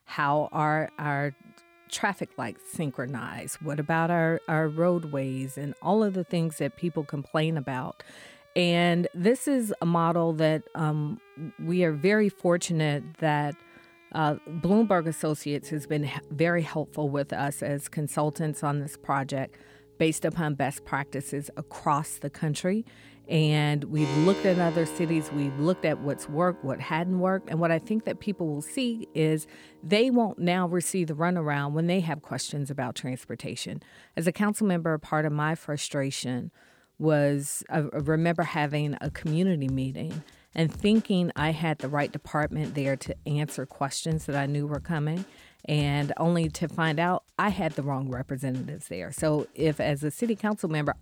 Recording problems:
background music; noticeable; throughout; 20 dB below the speech

